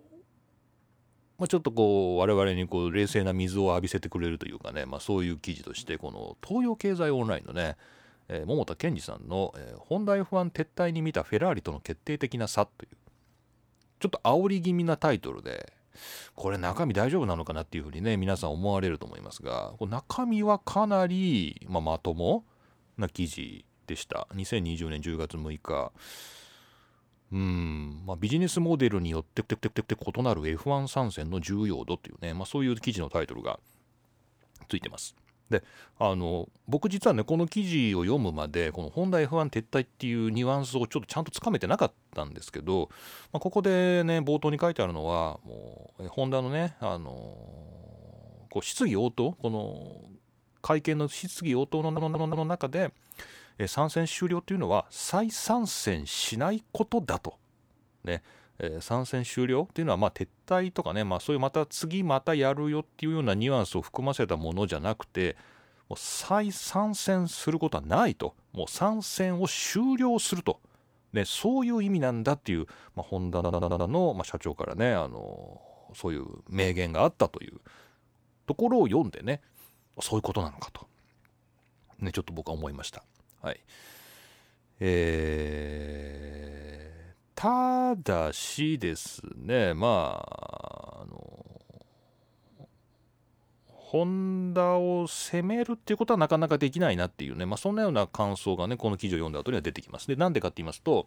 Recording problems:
audio stuttering; 4 times, first at 29 s

